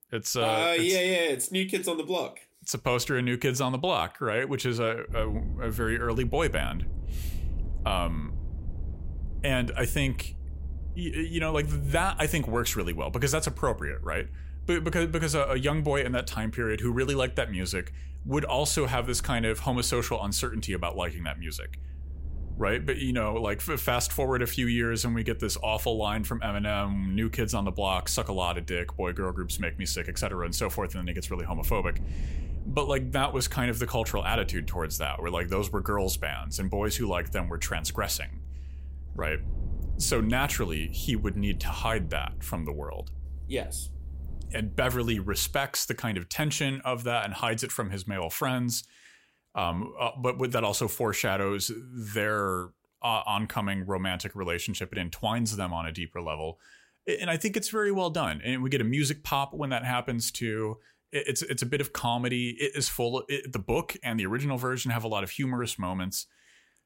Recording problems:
low rumble; faint; from 5 to 46 s; 25 dB below the speech

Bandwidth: 16 kHz